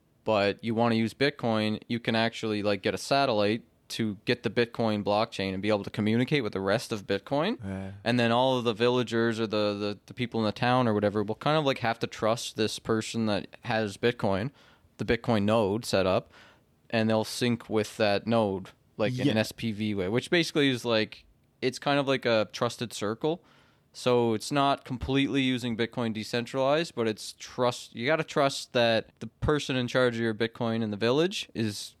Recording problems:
none

